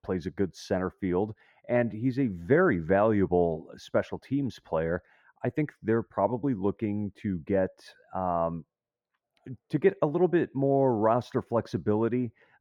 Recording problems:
muffled; very; fading above 2.5 kHz

